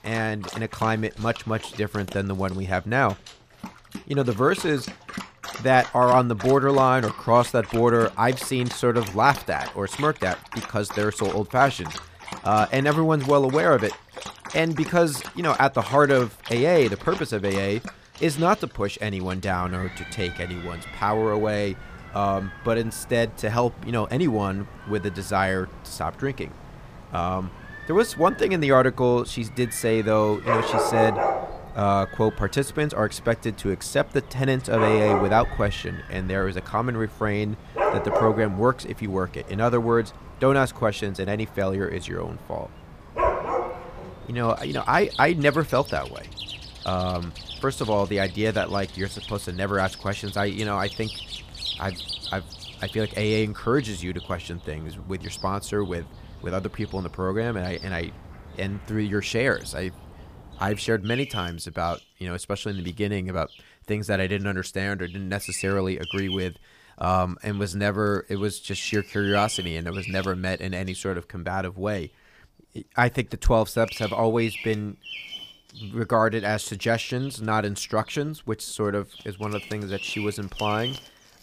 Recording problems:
animal sounds; noticeable; throughout; 10 dB below the speech

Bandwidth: 15 kHz